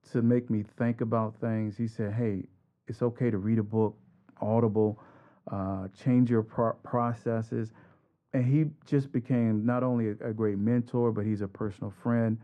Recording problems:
muffled; very; fading above 2 kHz

